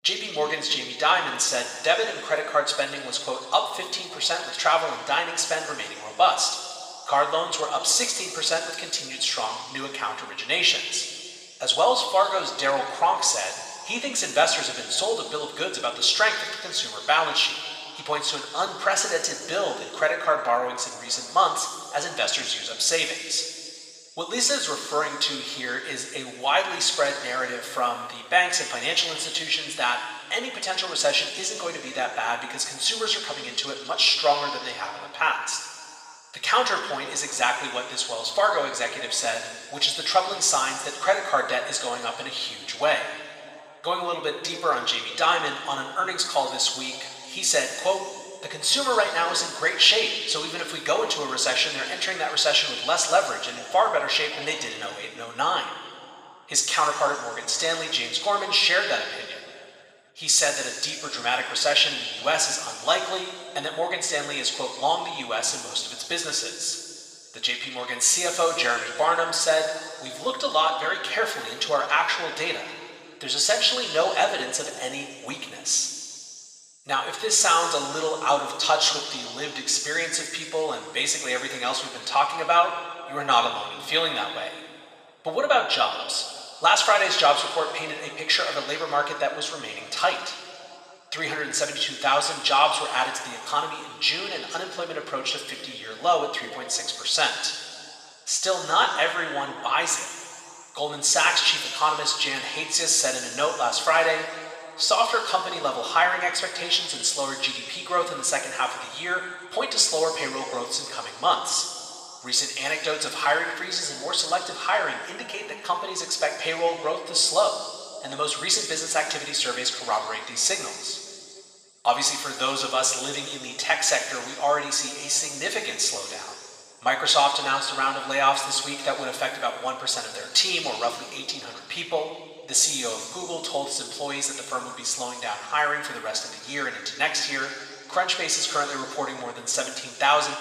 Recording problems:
thin; very; fading below 800 Hz
room echo; noticeable; dies away in 2.2 s
off-mic speech; somewhat distant

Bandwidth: 15 kHz